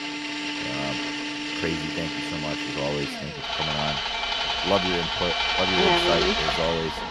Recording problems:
machinery noise; very loud; throughout; 3 dB above the speech

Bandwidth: 14.5 kHz